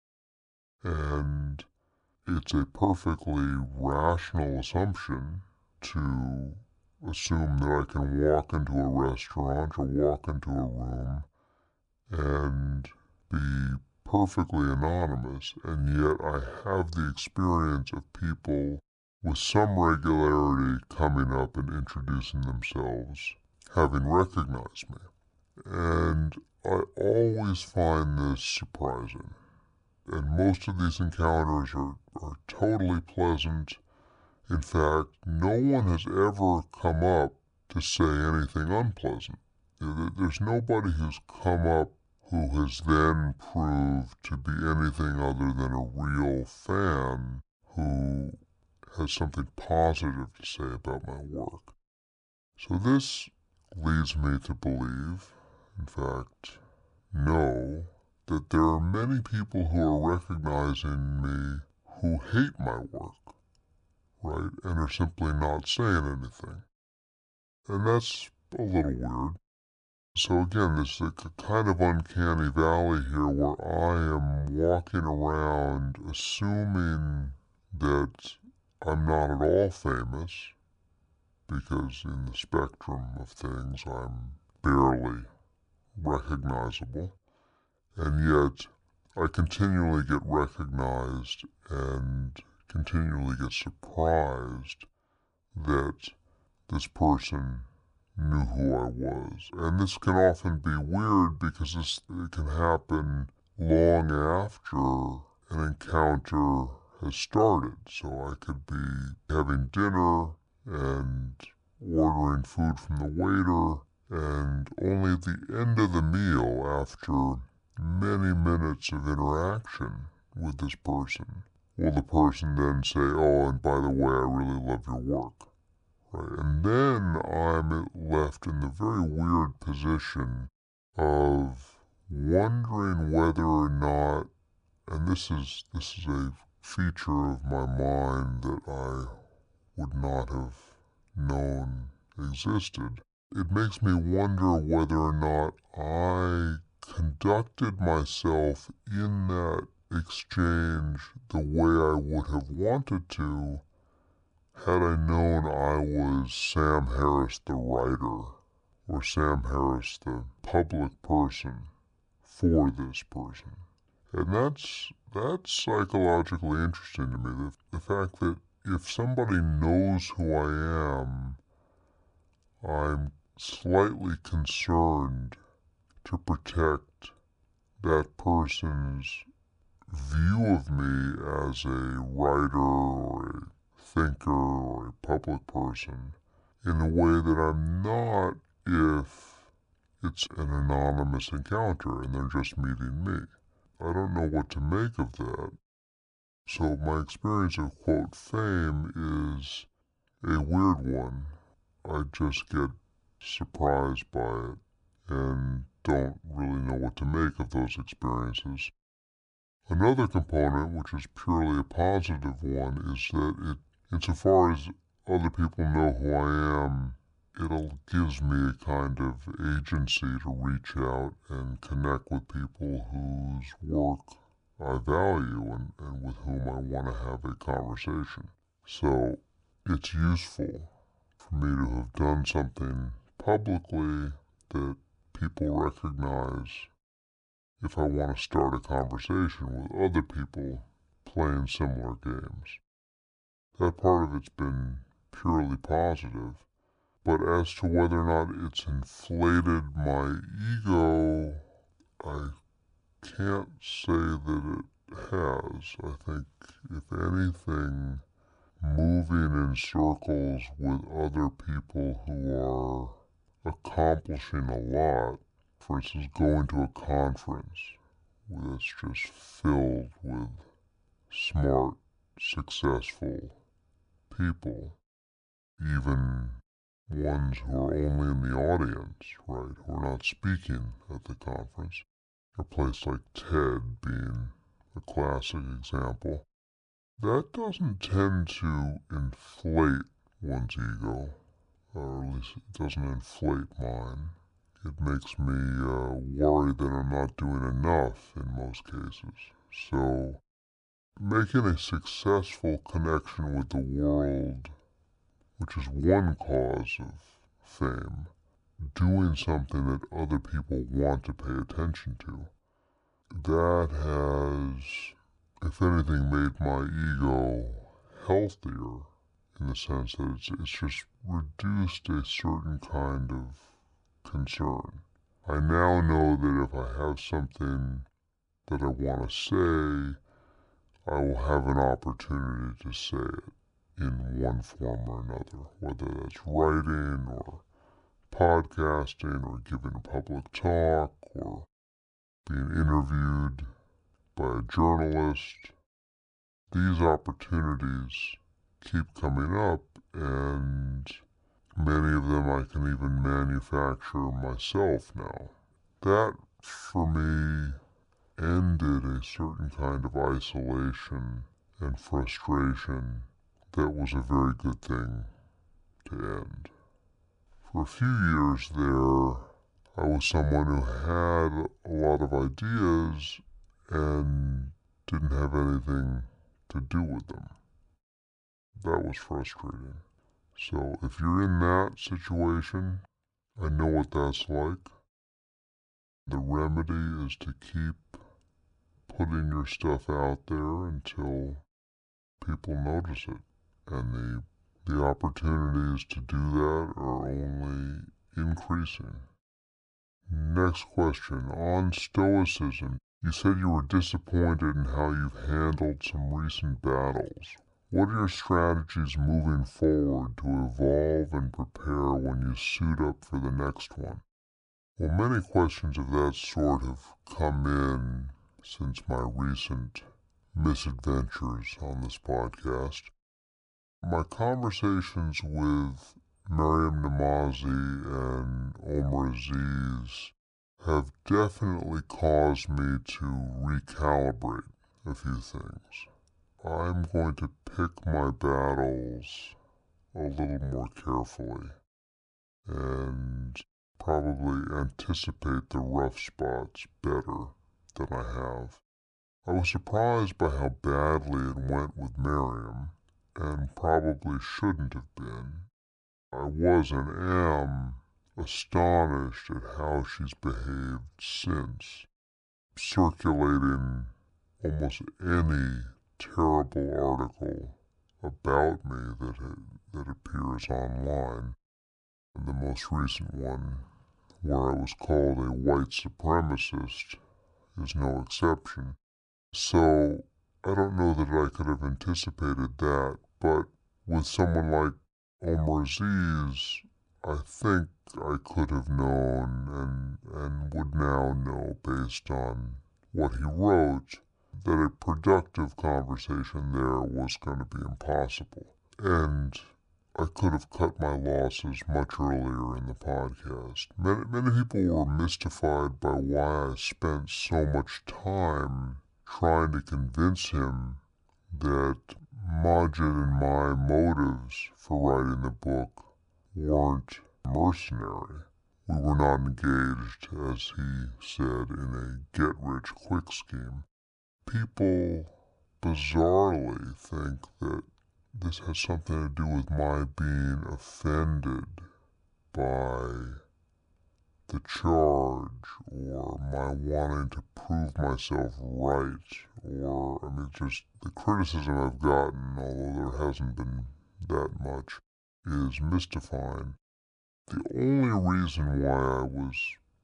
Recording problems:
wrong speed and pitch; too slow and too low; 0.7 times normal speed

